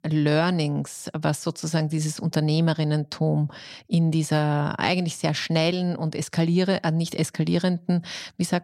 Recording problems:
none

